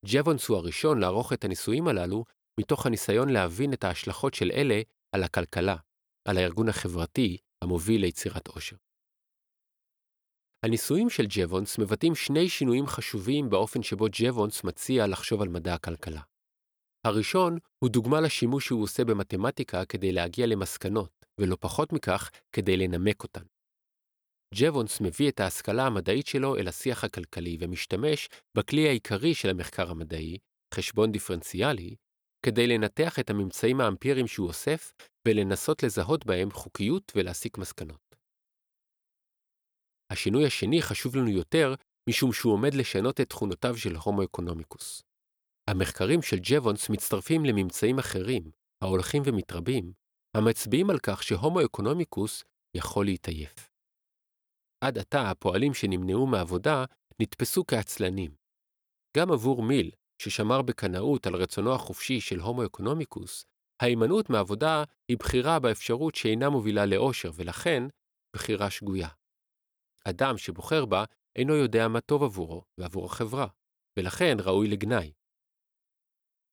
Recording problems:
none

